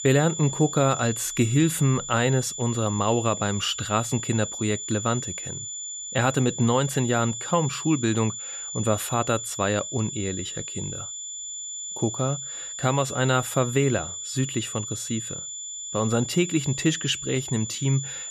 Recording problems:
high-pitched whine; loud; throughout; 7 kHz, 7 dB below the speech

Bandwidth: 14.5 kHz